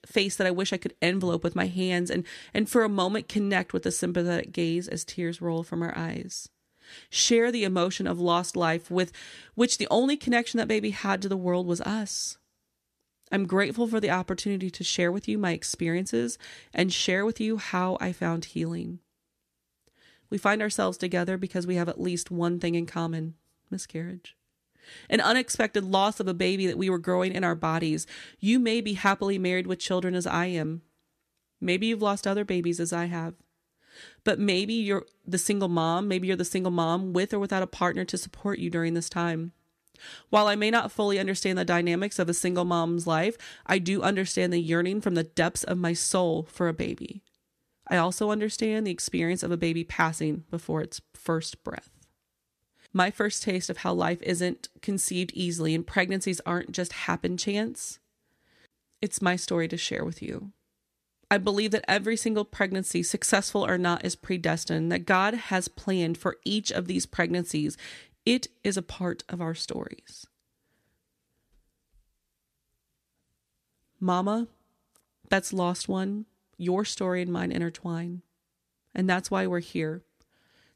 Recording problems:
none

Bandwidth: 14.5 kHz